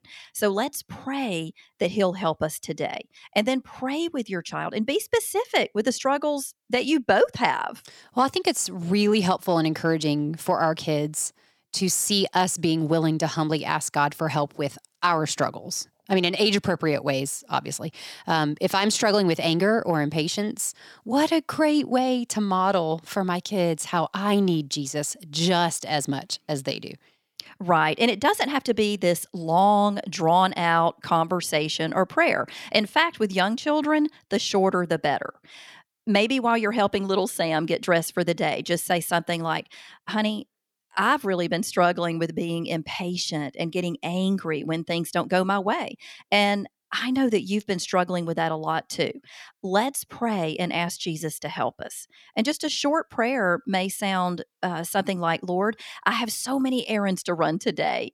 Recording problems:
none

